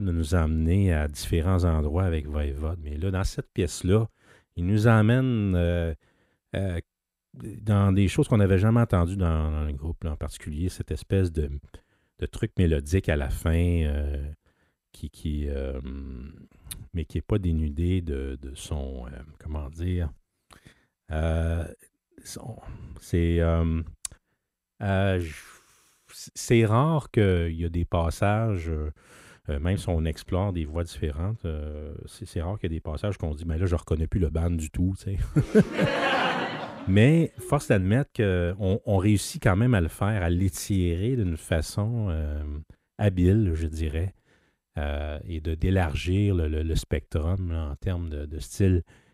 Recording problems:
abrupt cut into speech; at the start

